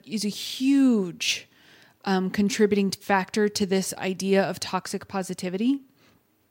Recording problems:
none

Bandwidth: 16 kHz